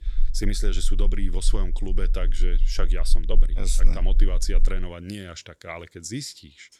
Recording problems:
low rumble; faint; until 5 s; 20 dB below the speech

